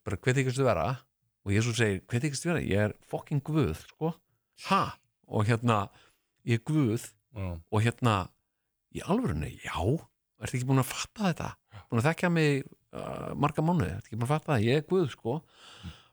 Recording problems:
none

